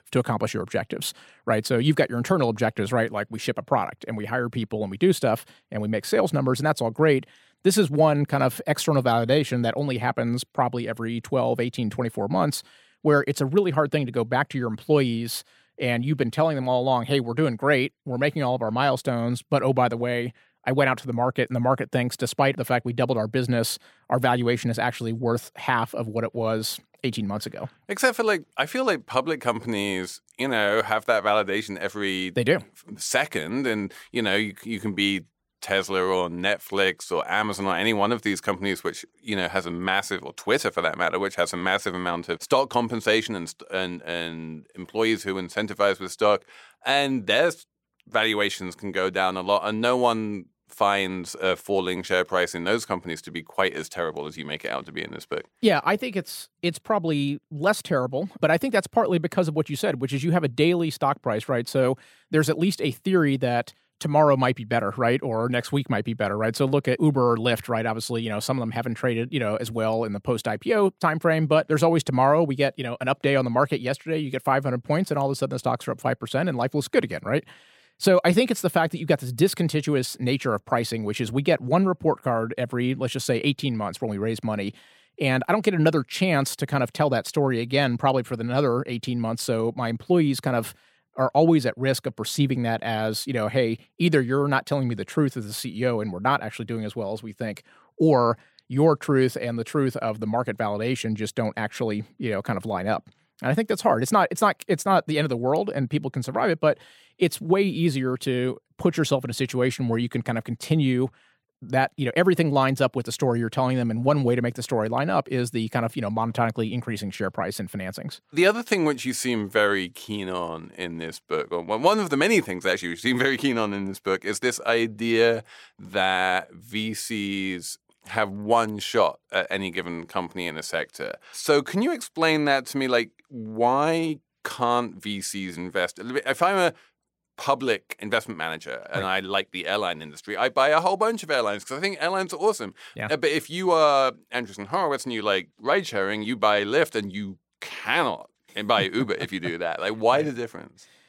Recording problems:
none

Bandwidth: 16.5 kHz